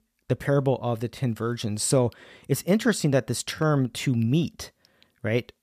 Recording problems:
none

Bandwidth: 14.5 kHz